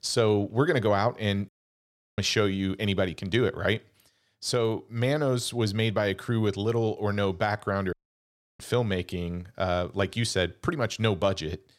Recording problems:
audio cutting out; at 1.5 s for 0.5 s and at 8 s for 0.5 s

